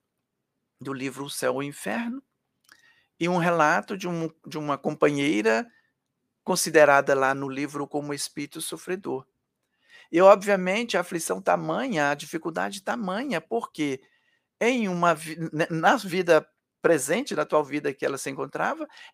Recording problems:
none

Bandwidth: 15 kHz